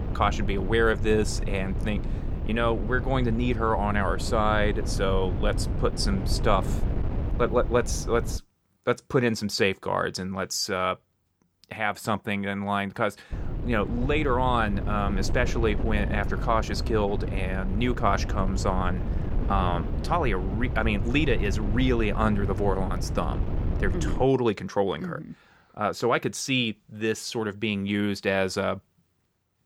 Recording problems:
wind noise on the microphone; occasional gusts; until 8.5 s and from 13 to 24 s; 15 dB below the speech

